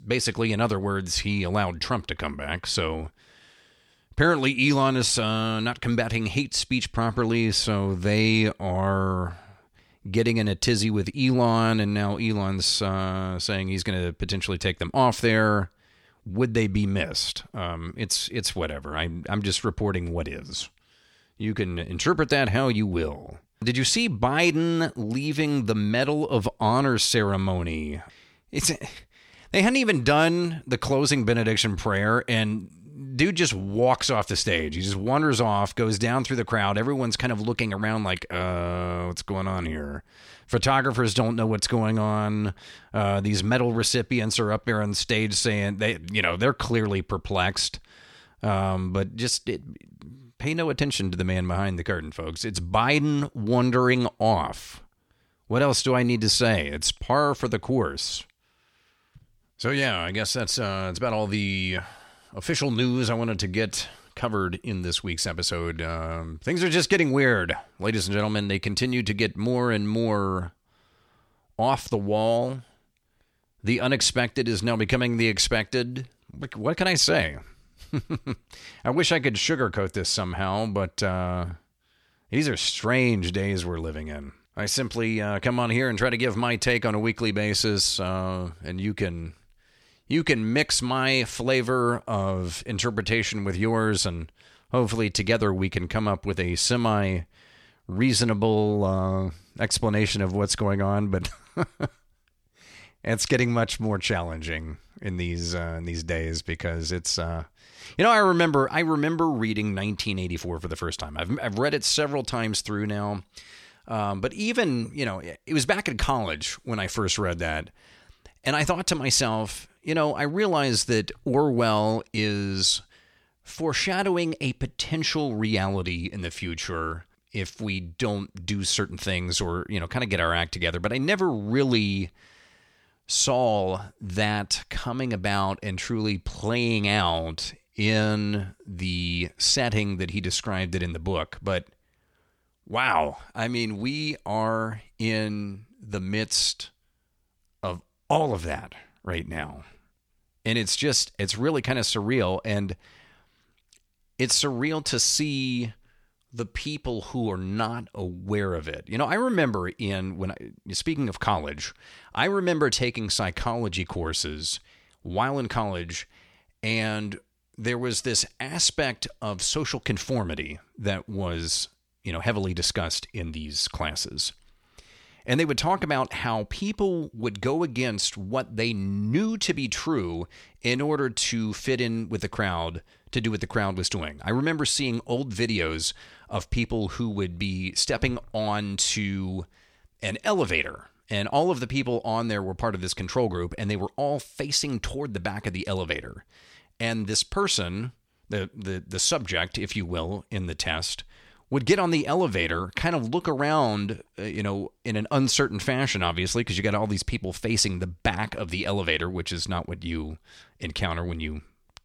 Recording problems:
none

